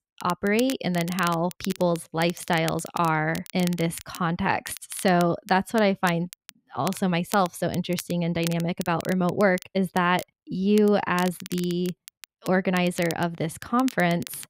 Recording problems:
crackle, like an old record; noticeable; 15 dB below the speech

